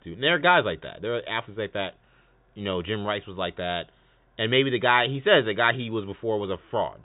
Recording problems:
high frequencies cut off; severe; nothing above 4 kHz

